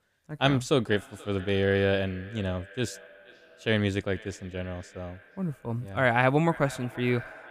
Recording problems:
echo of what is said; faint; throughout; 480 ms later, 20 dB below the speech

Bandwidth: 15 kHz